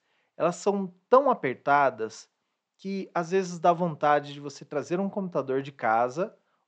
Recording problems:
high frequencies cut off; noticeable; nothing above 8 kHz

